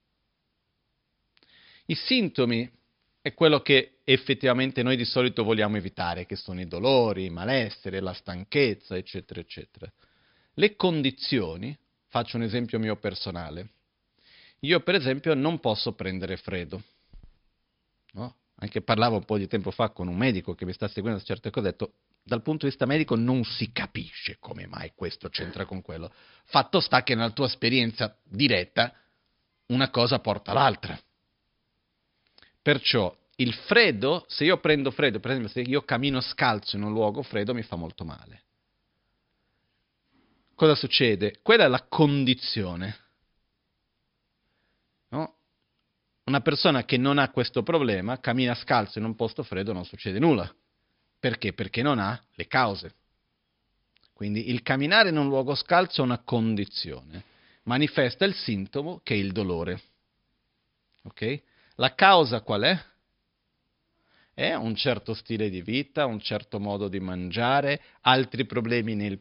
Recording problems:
high frequencies cut off; noticeable; nothing above 5.5 kHz

